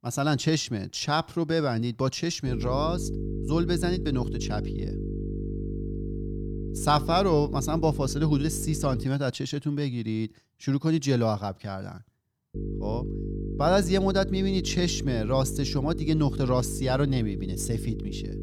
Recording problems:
electrical hum; noticeable; from 2.5 to 9 s and from 13 s on; 50 Hz, 10 dB below the speech

